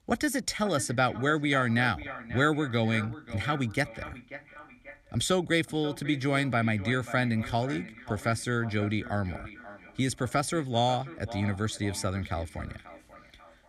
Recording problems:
echo of what is said; noticeable; throughout; 540 ms later, 15 dB below the speech

